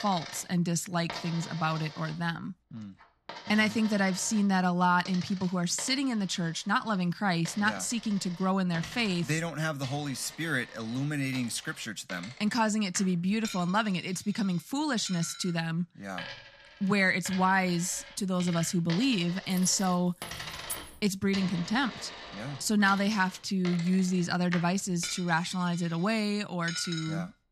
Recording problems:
household noises; noticeable; throughout; 15 dB below the speech
jangling keys; noticeable; from 20 to 21 s; peak 9 dB below the speech

